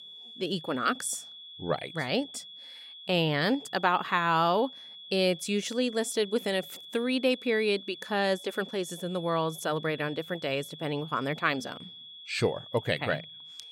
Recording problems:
high-pitched whine; noticeable; throughout; 3.5 kHz, 15 dB below the speech

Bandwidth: 16 kHz